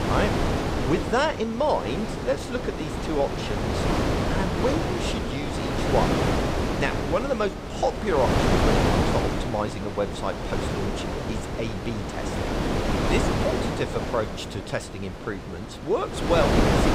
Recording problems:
wind noise on the microphone; heavy; as loud as the speech

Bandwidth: 15.5 kHz